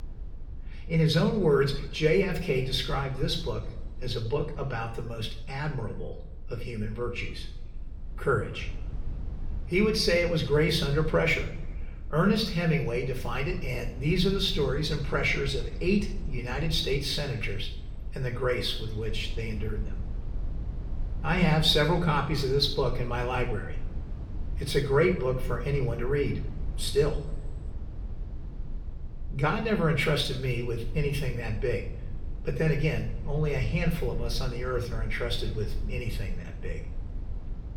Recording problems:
room echo; slight; dies away in 0.7 s
off-mic speech; somewhat distant
low rumble; faint; throughout; 25 dB below the speech

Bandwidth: 17 kHz